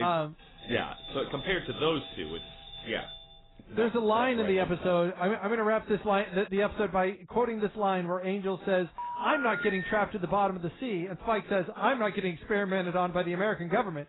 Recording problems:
garbled, watery; badly; nothing above 4 kHz
abrupt cut into speech; at the start
doorbell; faint; until 3.5 s; peak 15 dB below the speech
phone ringing; noticeable; from 9 to 10 s; peak 4 dB below the speech

